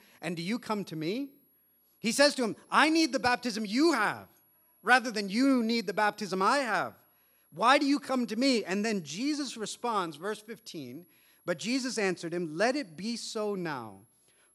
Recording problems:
high-pitched whine; faint; throughout; 11.5 kHz, 35 dB below the speech

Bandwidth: 14.5 kHz